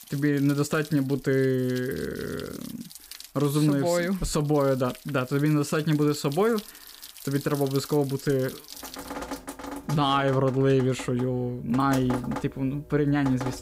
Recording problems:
rain or running water; noticeable; throughout; 15 dB below the speech

